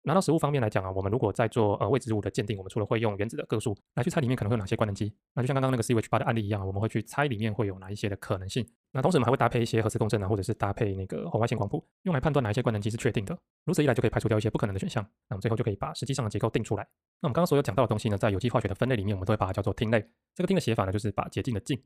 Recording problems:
wrong speed, natural pitch; too fast; 1.5 times normal speed

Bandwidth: 15 kHz